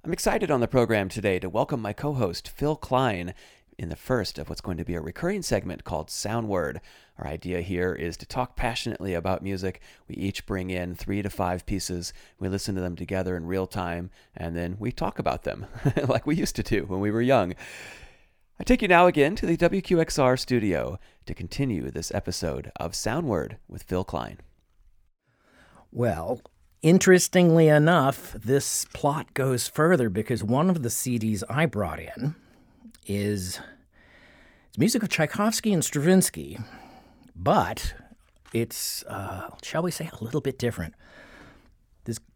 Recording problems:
none

